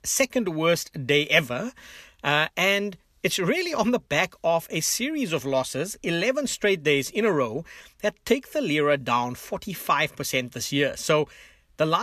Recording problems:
abrupt cut into speech; at the end

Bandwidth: 14 kHz